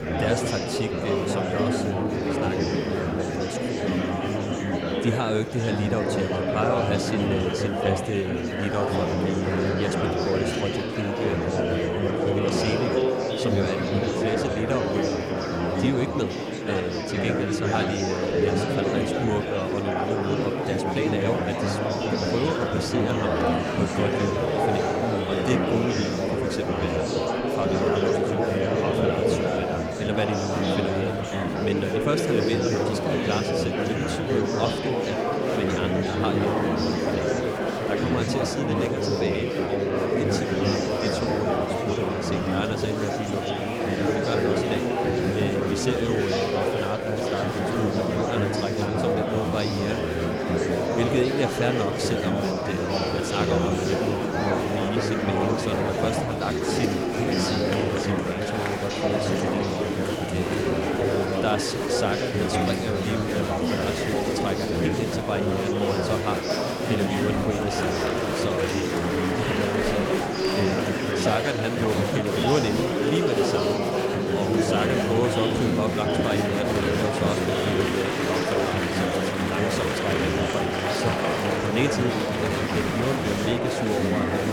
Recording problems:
murmuring crowd; very loud; throughout; 5 dB above the speech

